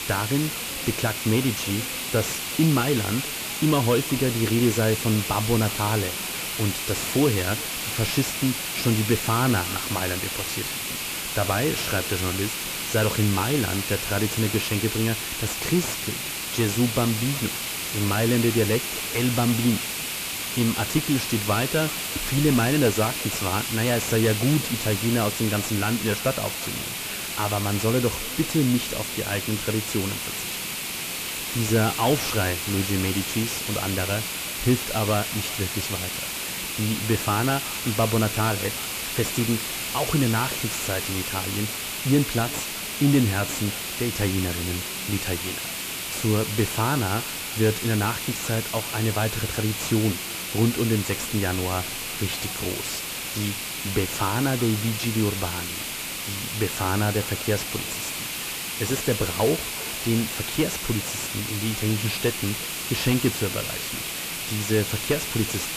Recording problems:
echo of what is said; faint; throughout; 370 ms later, 25 dB below the speech
distortion; slight; 10 dB below the speech
hiss; loud; throughout; 2 dB below the speech
background chatter; faint; throughout; 4 voices, 25 dB below the speech

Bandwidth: 14.5 kHz